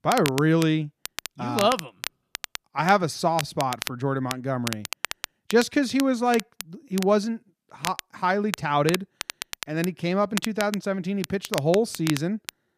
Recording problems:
crackle, like an old record; loud; 10 dB below the speech

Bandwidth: 14.5 kHz